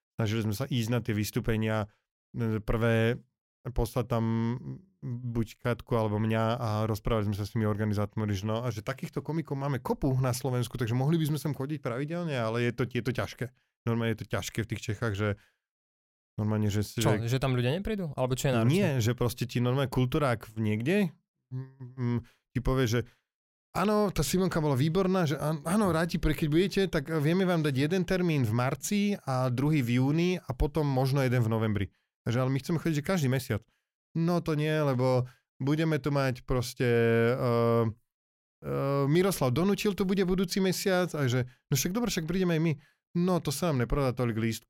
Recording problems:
none

